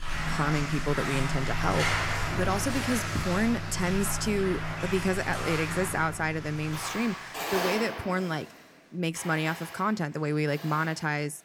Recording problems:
household noises; loud; throughout; 3 dB below the speech

